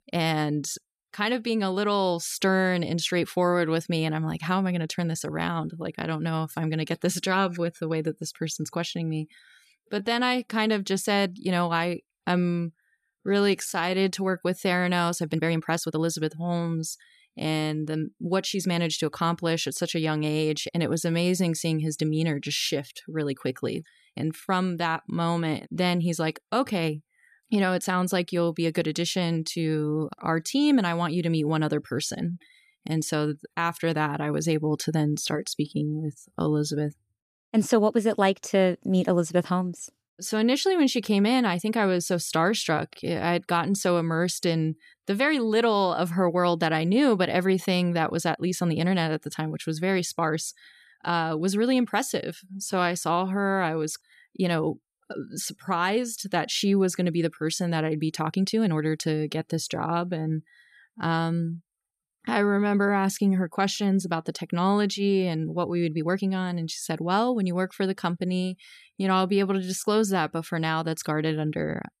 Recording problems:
uneven, jittery; strongly; from 4.5 s to 1:10

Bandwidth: 14.5 kHz